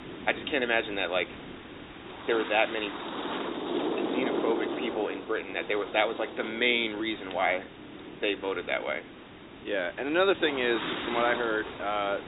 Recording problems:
high frequencies cut off; severe; nothing above 4 kHz
thin; somewhat; fading below 300 Hz
wind noise on the microphone; heavy; 7 dB below the speech
hiss; noticeable; throughout; 20 dB below the speech

